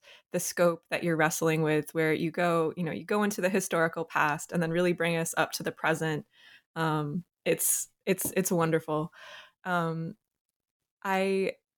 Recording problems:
none

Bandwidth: 18 kHz